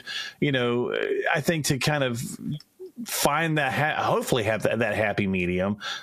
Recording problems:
squashed, flat; heavily

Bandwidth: 14.5 kHz